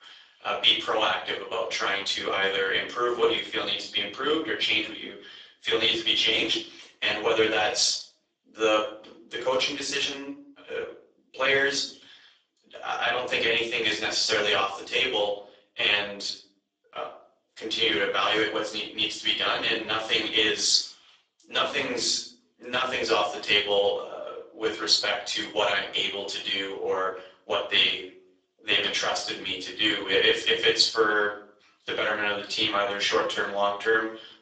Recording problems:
off-mic speech; far
garbled, watery; badly; nothing above 7.5 kHz
thin; very; fading below 300 Hz
room echo; slight; dies away in 0.4 s

